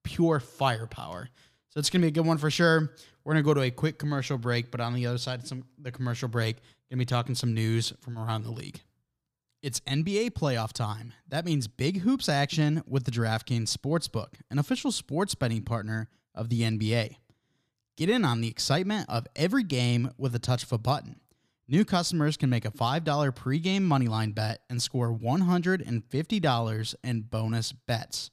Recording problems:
none

